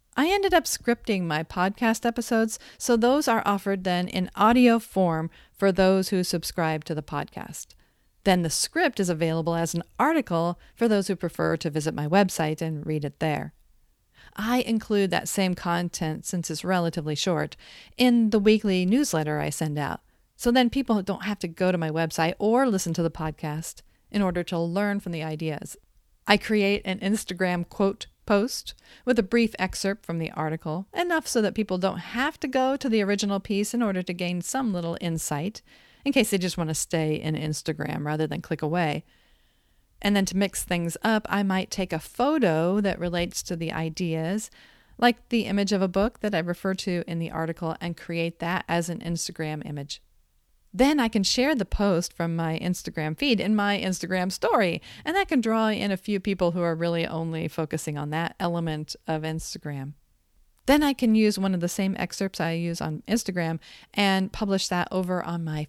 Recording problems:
none

